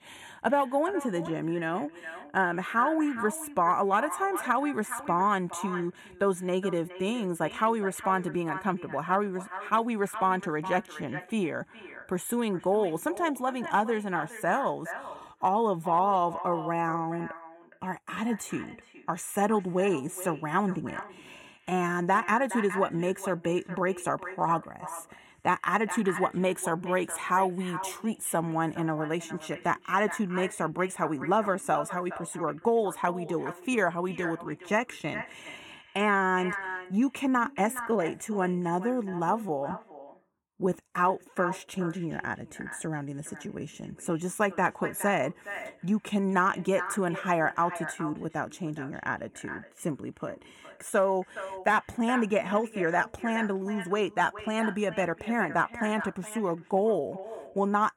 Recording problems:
echo of what is said; strong; throughout; 420 ms later, 10 dB below the speech

